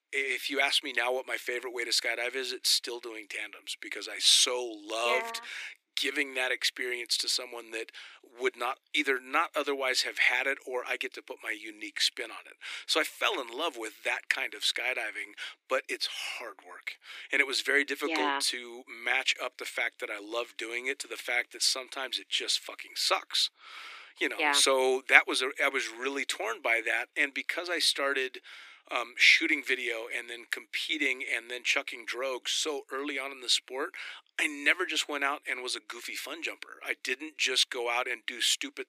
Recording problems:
thin; somewhat; fading below 300 Hz

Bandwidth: 15 kHz